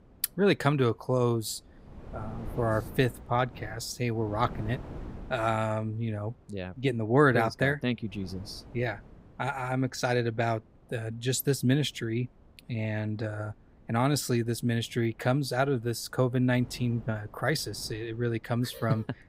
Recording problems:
wind noise on the microphone; occasional gusts; 25 dB below the speech

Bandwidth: 15.5 kHz